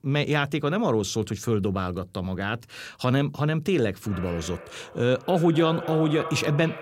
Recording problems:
echo of what is said; strong; from 4 s on; 260 ms later, 10 dB below the speech

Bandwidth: 16 kHz